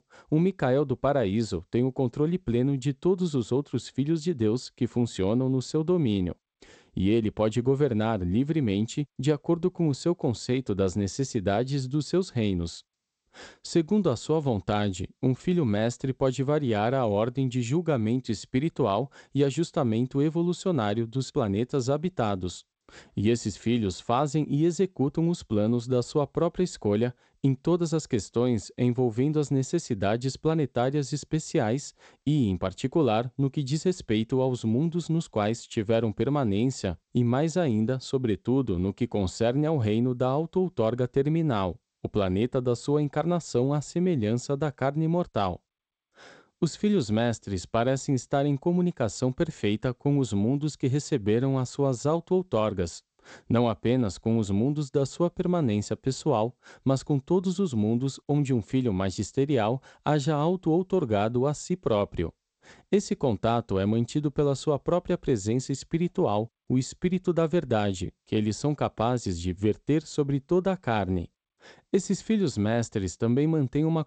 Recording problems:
garbled, watery; slightly; nothing above 8 kHz

